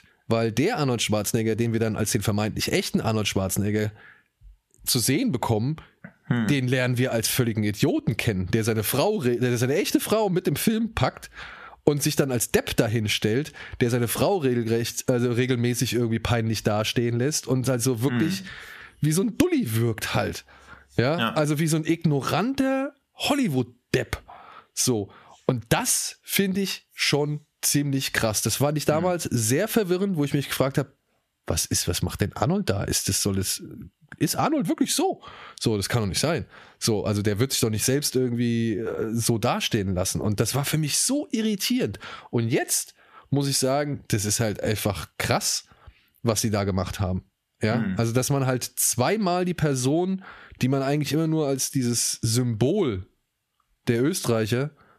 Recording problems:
squashed, flat; heavily

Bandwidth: 14.5 kHz